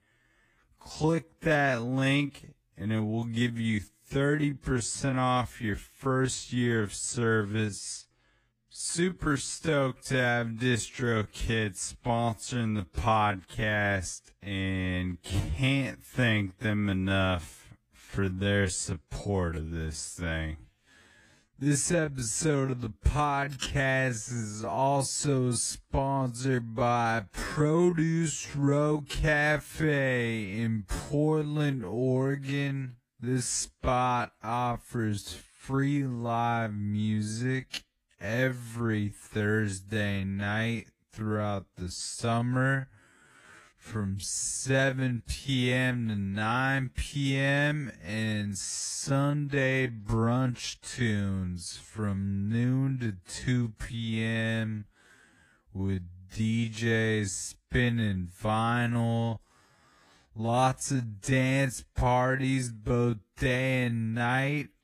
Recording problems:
wrong speed, natural pitch; too slow; 0.5 times normal speed
garbled, watery; slightly; nothing above 15 kHz

